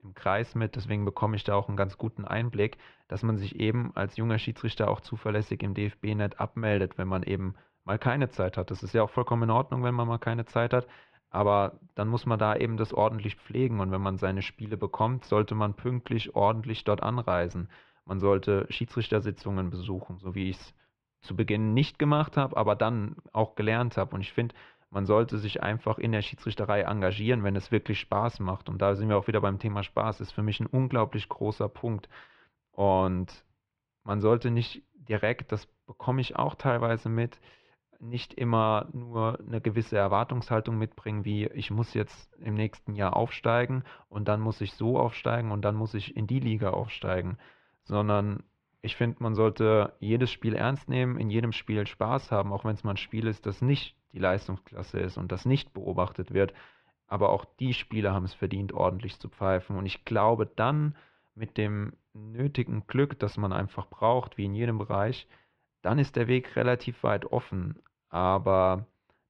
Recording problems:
muffled; very; fading above 2.5 kHz

